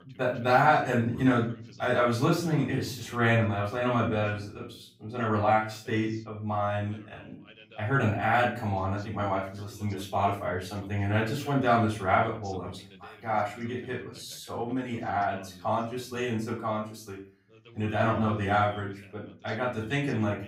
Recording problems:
off-mic speech; far
room echo; slight; dies away in 0.4 s
voice in the background; faint; throughout; 25 dB below the speech

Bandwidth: 15.5 kHz